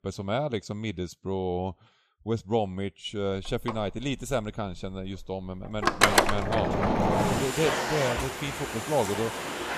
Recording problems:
household noises; very loud; from 3 s on; 5 dB above the speech

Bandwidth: 14.5 kHz